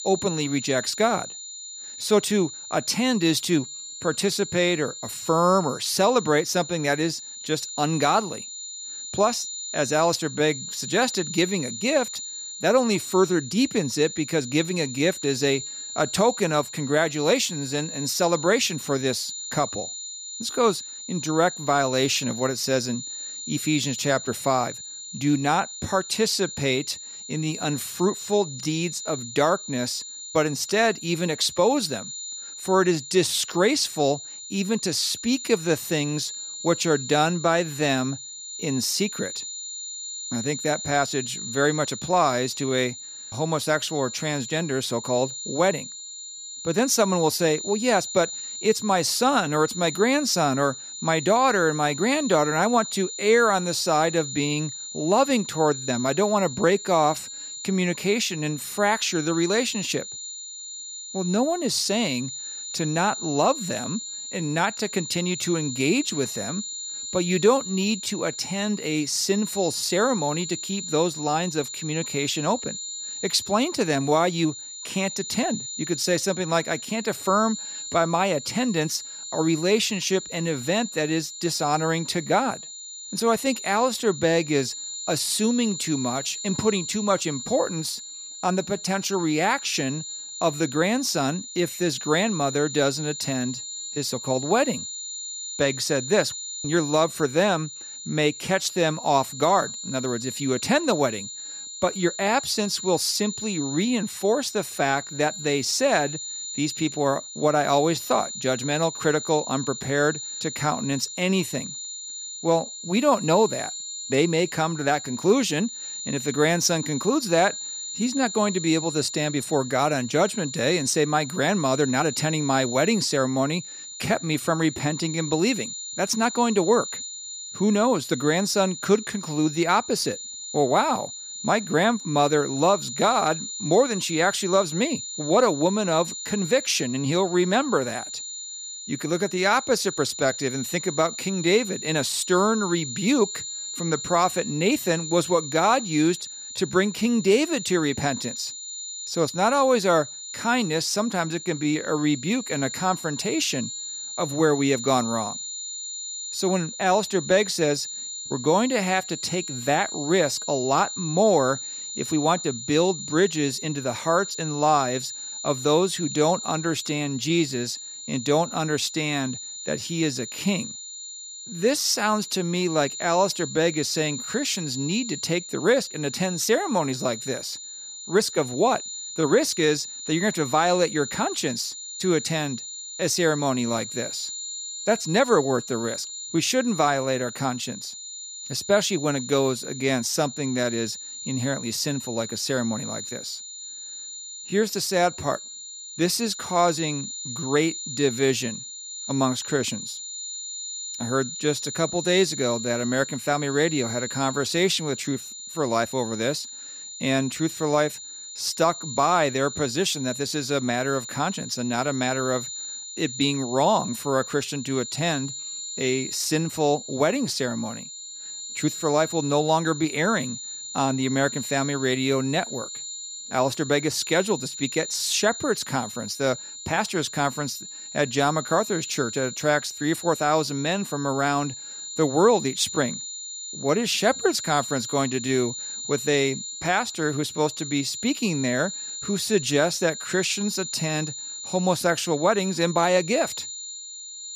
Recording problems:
high-pitched whine; loud; throughout; 7 kHz, 9 dB below the speech

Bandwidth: 14.5 kHz